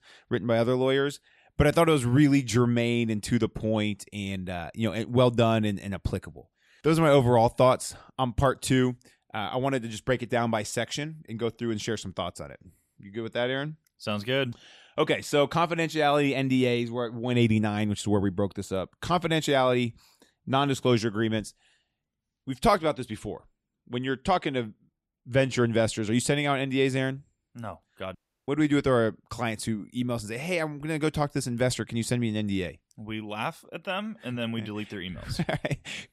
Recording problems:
audio cutting out; at 28 s

